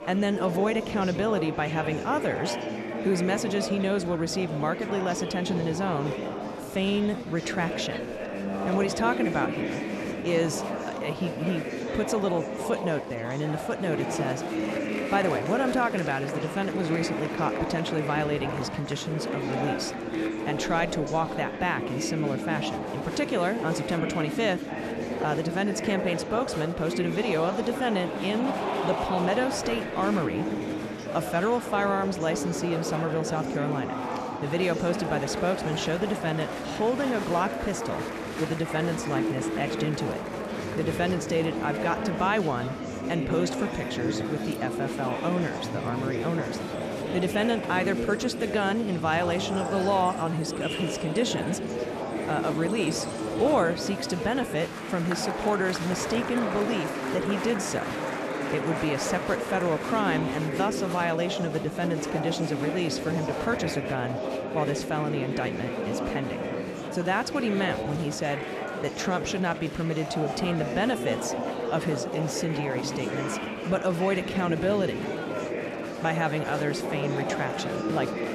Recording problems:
murmuring crowd; loud; throughout; 3 dB below the speech

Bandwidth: 13.5 kHz